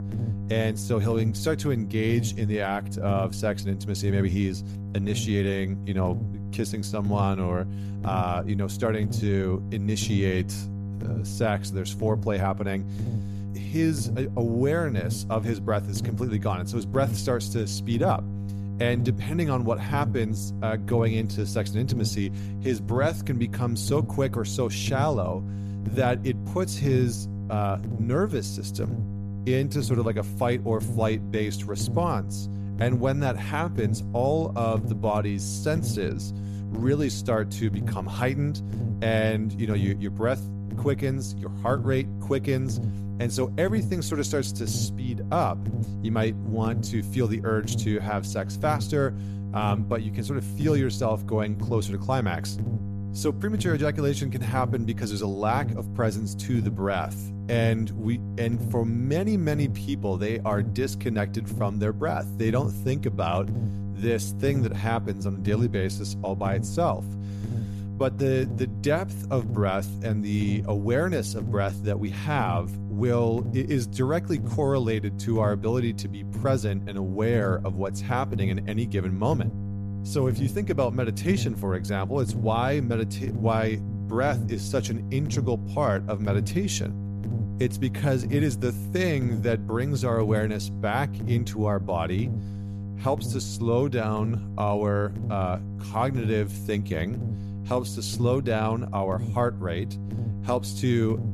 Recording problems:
electrical hum; noticeable; throughout; 50 Hz, 15 dB below the speech

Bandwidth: 14.5 kHz